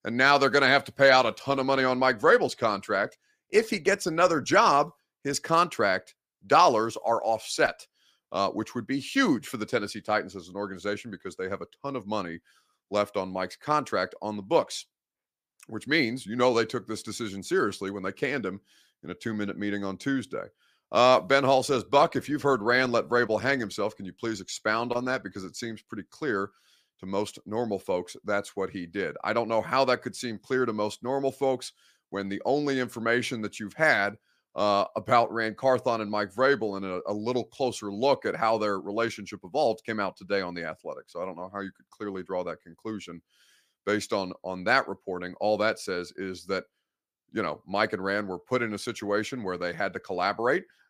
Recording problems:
none

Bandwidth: 15 kHz